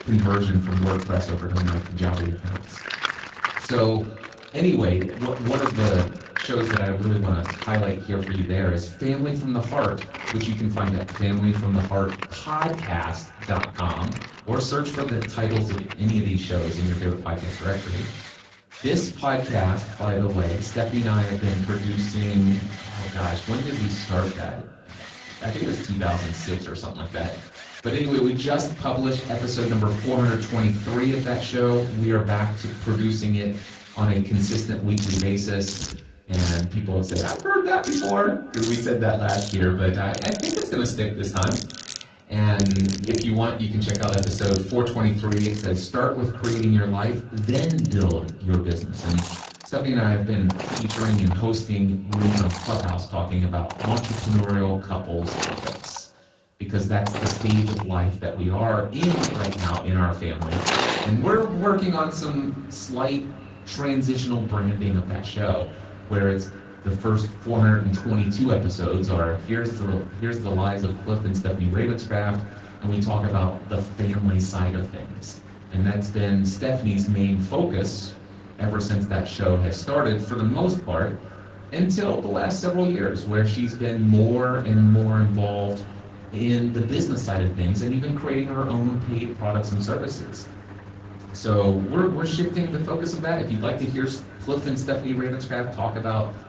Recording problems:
off-mic speech; far
echo of what is said; faint; throughout; 290 ms later, 25 dB below the speech
room echo; slight; dies away in 0.3 s
garbled, watery; slightly
machinery noise; noticeable; throughout; 10 dB below the speech

